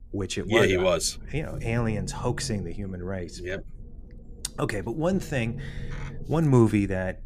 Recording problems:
low rumble; faint; throughout; 20 dB below the speech

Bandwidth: 14.5 kHz